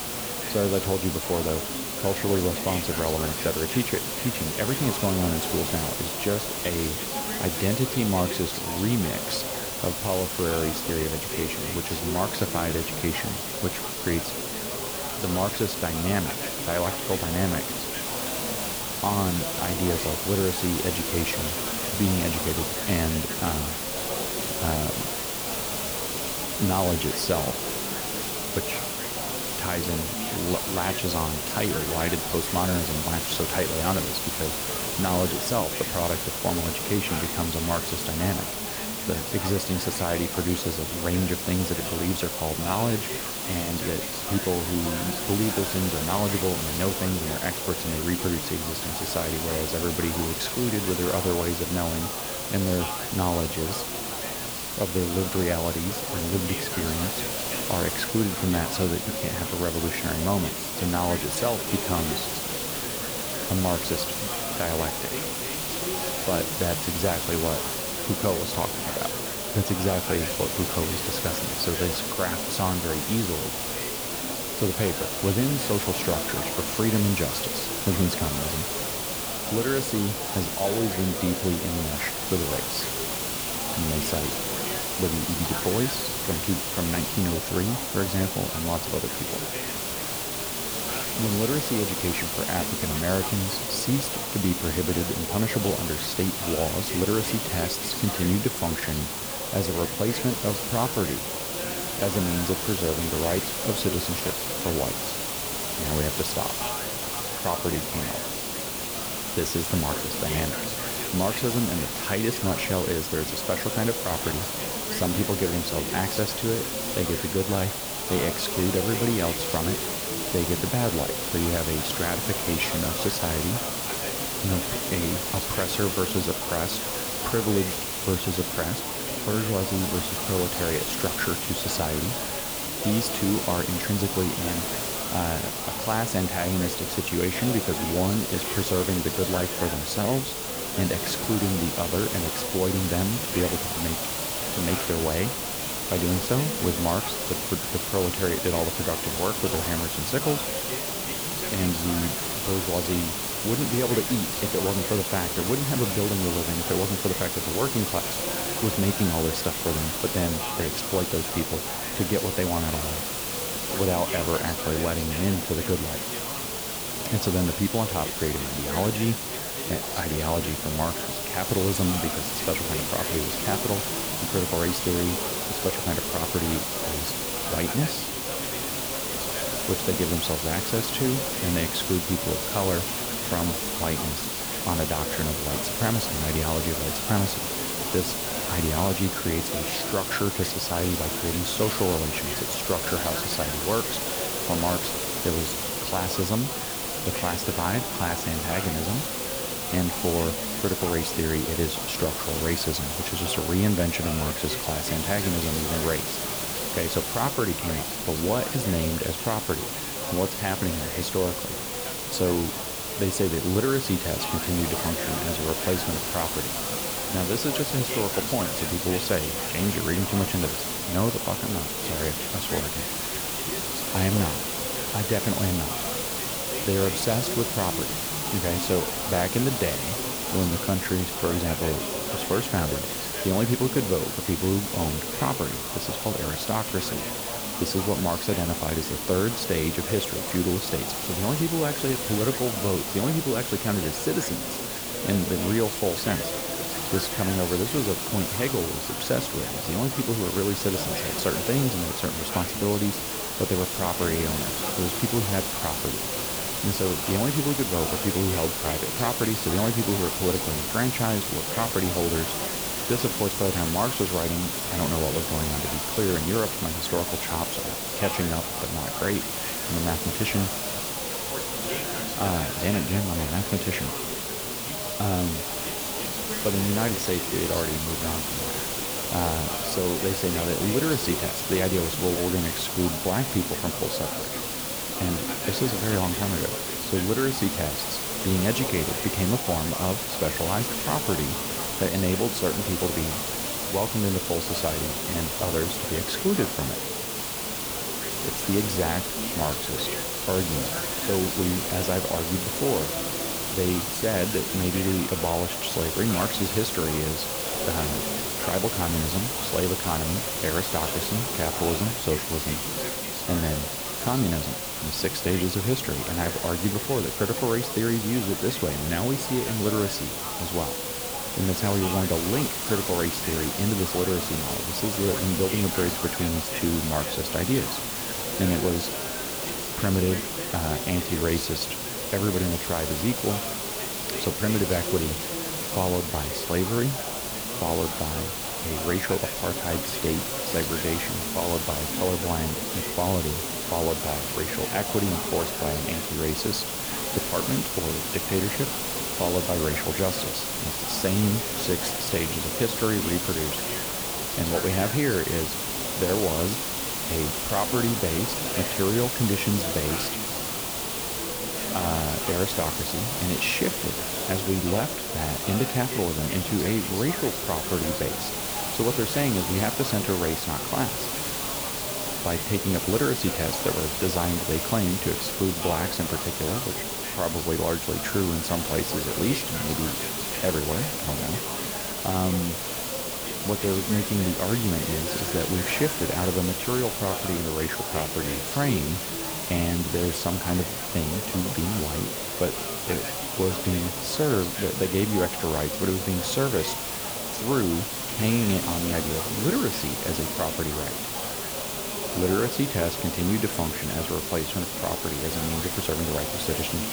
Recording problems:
background chatter; loud; throughout; 4 voices, 9 dB below the speech
hiss; loud; throughout; as loud as the speech

